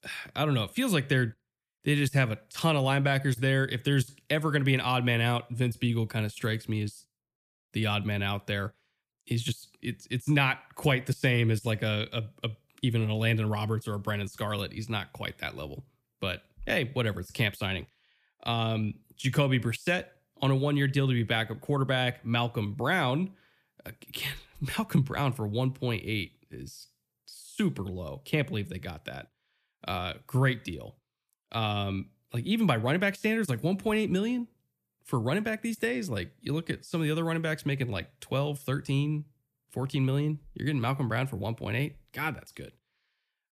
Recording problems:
none

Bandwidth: 14.5 kHz